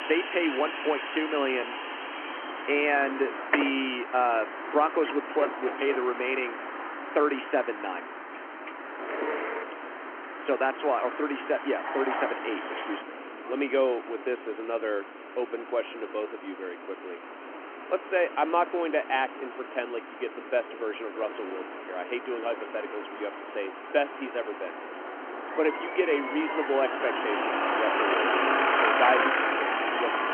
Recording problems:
phone-call audio
traffic noise; loud; throughout; 2 dB below the speech

